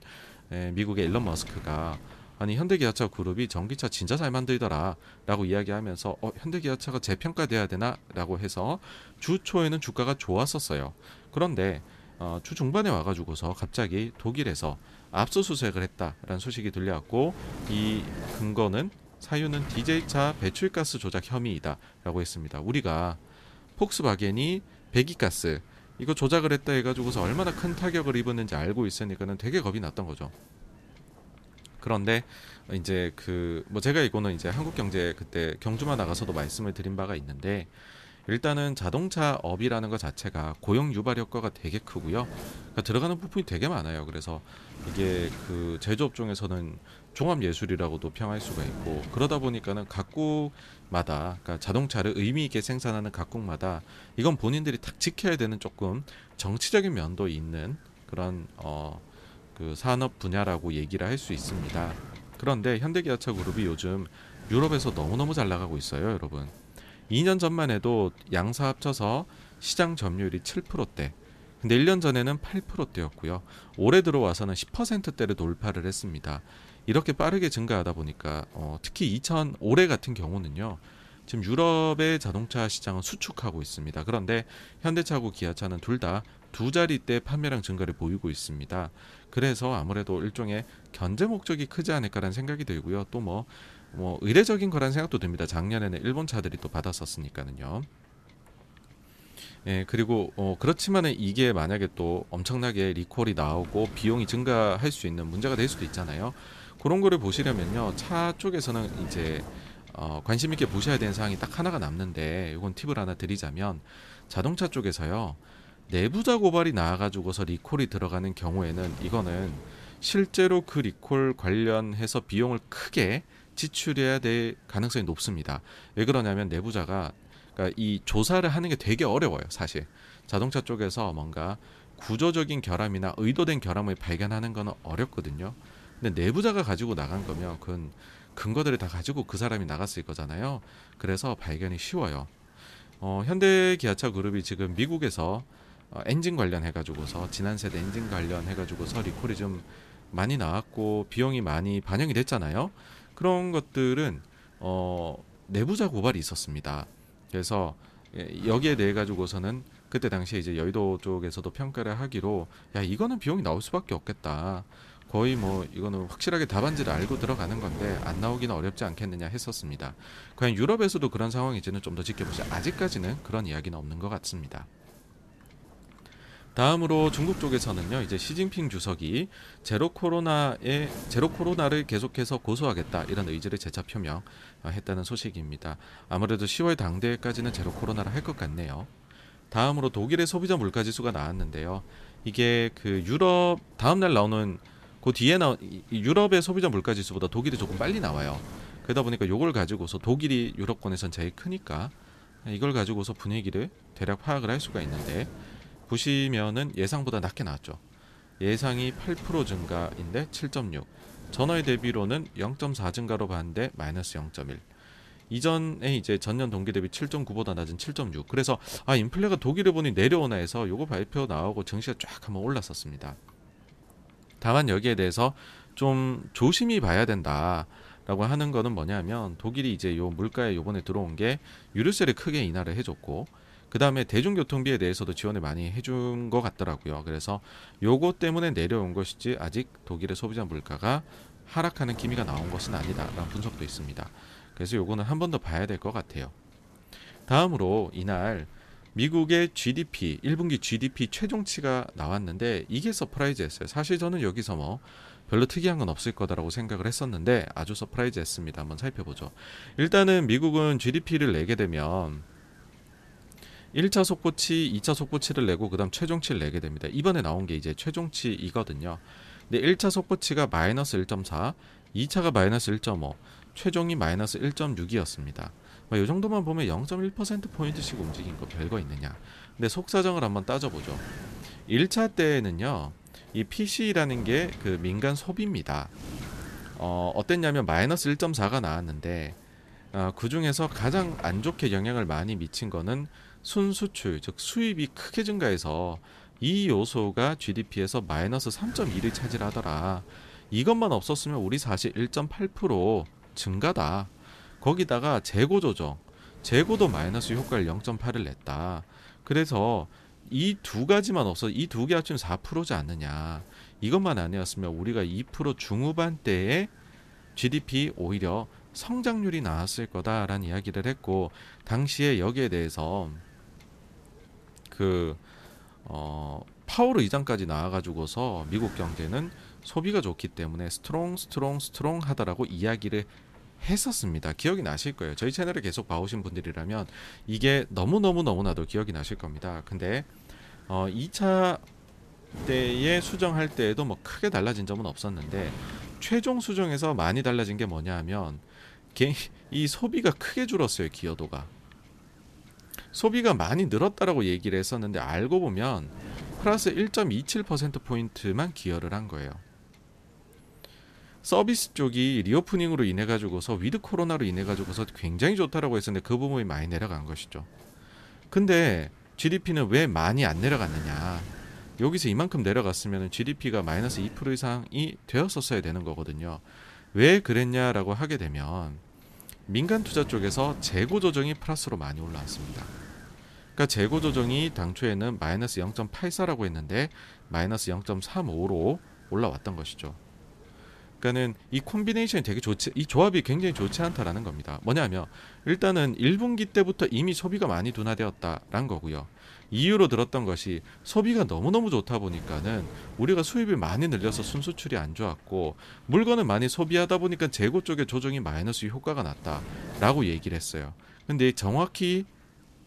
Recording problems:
wind noise on the microphone; occasional gusts; 20 dB below the speech

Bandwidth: 14.5 kHz